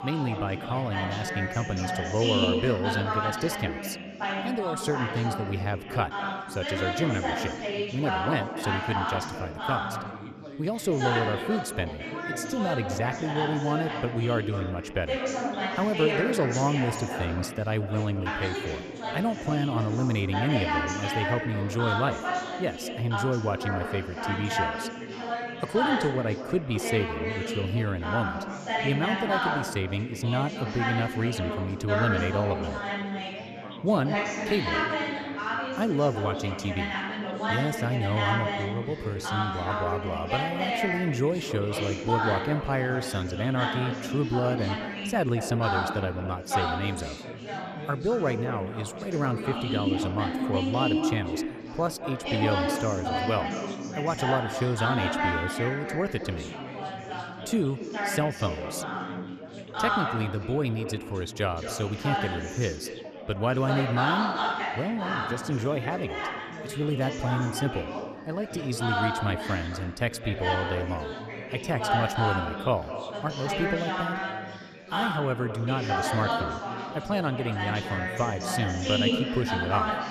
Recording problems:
echo of what is said; strong; throughout; 210 ms later, 10 dB below the speech
chatter from many people; loud; throughout; 1 dB below the speech

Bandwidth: 14.5 kHz